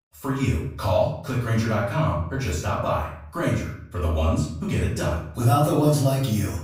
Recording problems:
off-mic speech; far
room echo; noticeable; dies away in 0.6 s

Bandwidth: 15.5 kHz